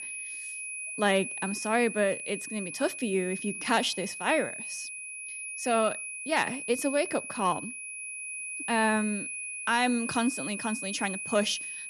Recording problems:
high-pitched whine; loud; throughout; 2.5 kHz, 6 dB below the speech

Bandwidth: 13.5 kHz